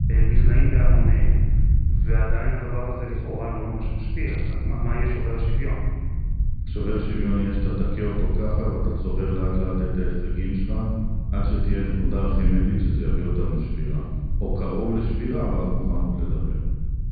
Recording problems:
room echo; strong; dies away in 1.7 s
off-mic speech; far
high frequencies cut off; severe; nothing above 4.5 kHz
low rumble; loud; throughout; 10 dB below the speech
crackling; faint; at 4.5 s; 25 dB below the speech

